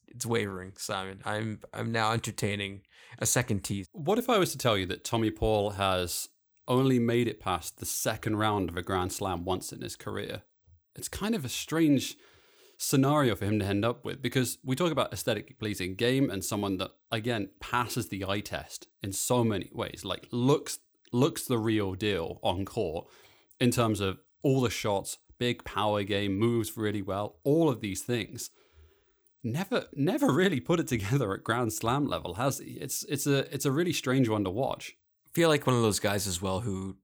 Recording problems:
none

